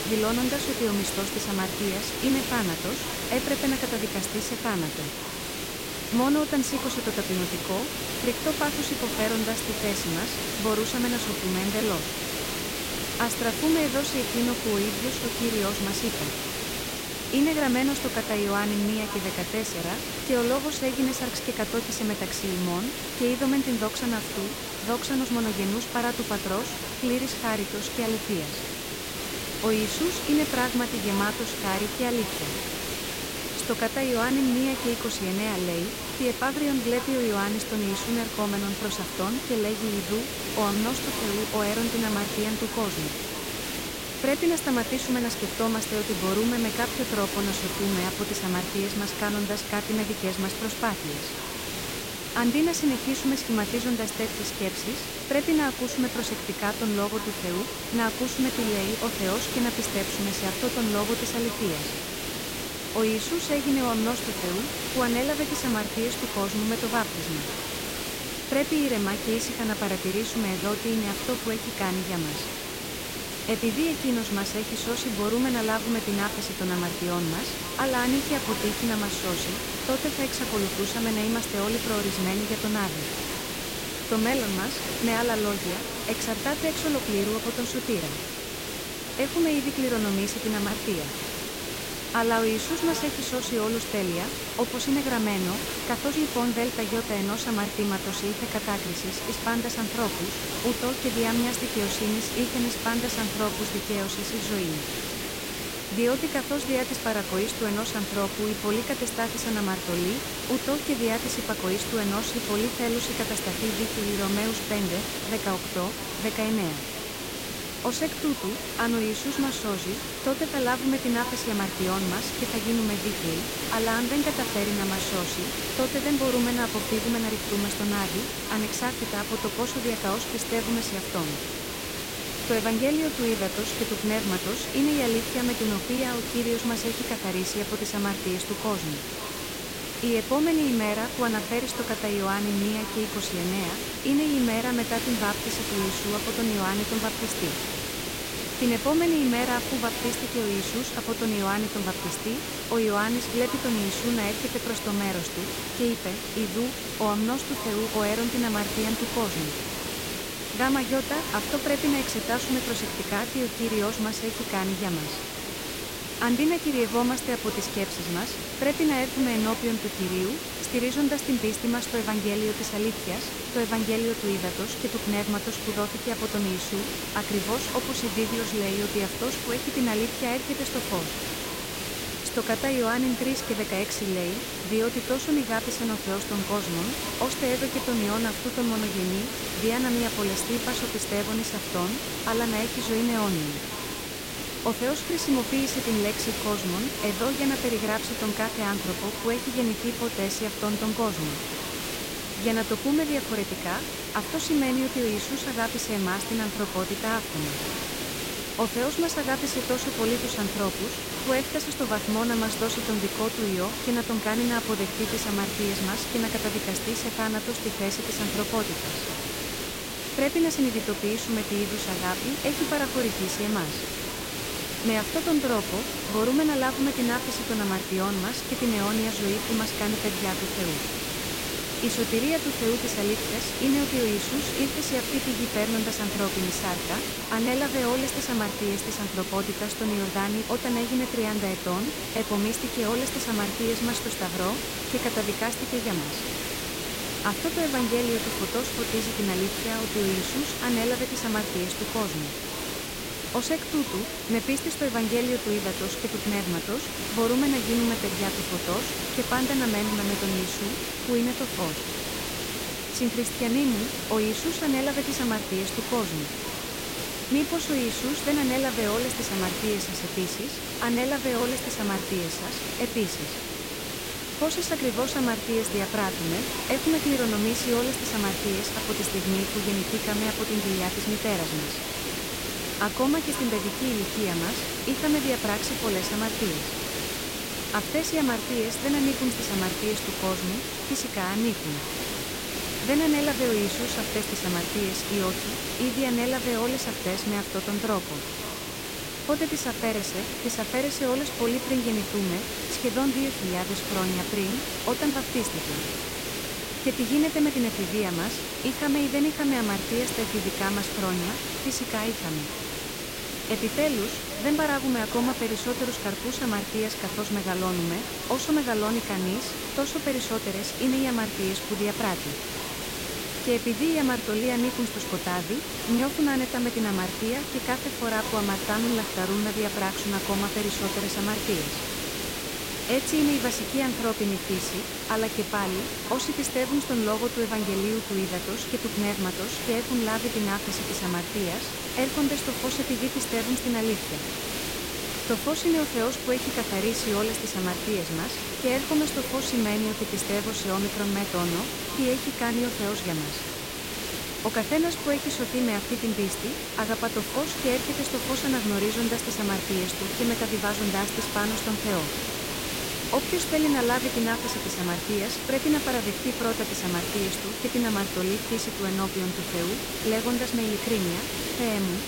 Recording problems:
echo of what is said; noticeable; throughout; 520 ms later, 15 dB below the speech
hiss; loud; throughout; 2 dB below the speech
chatter from many people; faint; throughout; 20 dB below the speech

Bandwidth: 16 kHz